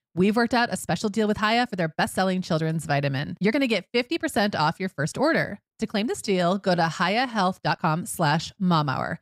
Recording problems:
uneven, jittery; strongly; from 0.5 to 8.5 s

